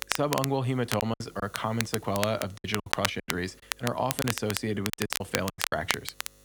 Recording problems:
crackle, like an old record; loud; 2 dB below the speech
electrical hum; faint; throughout; 50 Hz, 30 dB below the speech
choppy; very; 11% of the speech affected

